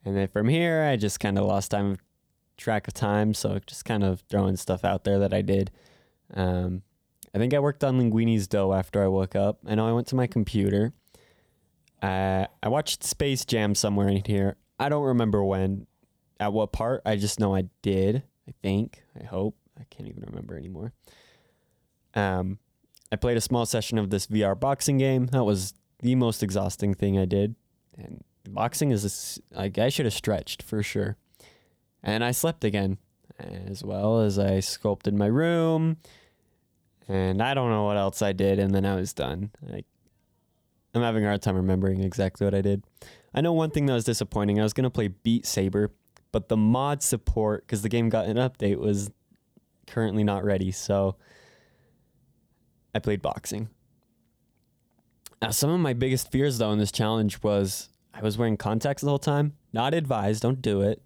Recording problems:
none

